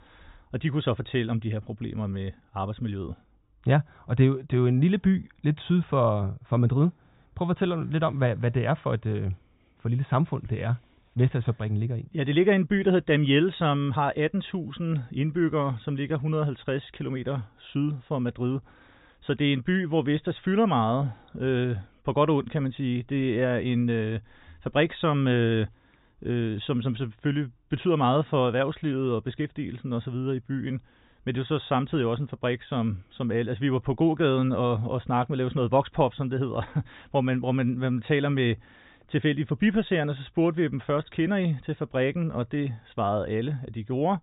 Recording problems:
high frequencies cut off; severe; nothing above 4 kHz

